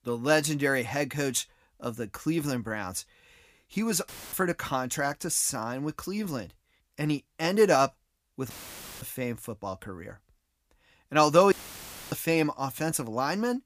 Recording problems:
audio cutting out; filled with static; at 4 s, at 8.5 s for 0.5 s and at 12 s for 0.5 s

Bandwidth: 15 kHz